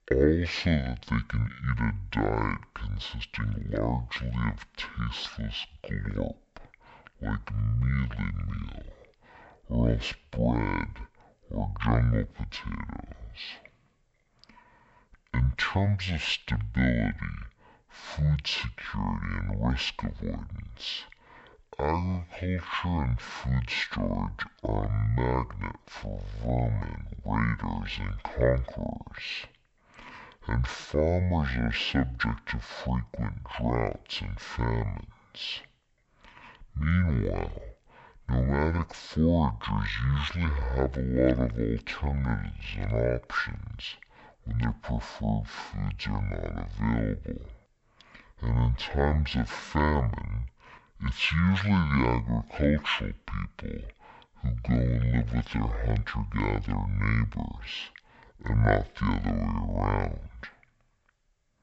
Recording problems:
wrong speed and pitch; too slow and too low; 0.5 times normal speed

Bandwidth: 8 kHz